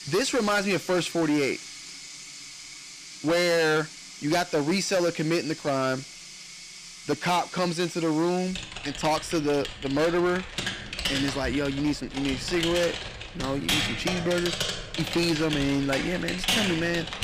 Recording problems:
distortion; heavy; 11% of the sound clipped
household noises; loud; throughout; 6 dB below the speech

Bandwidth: 15 kHz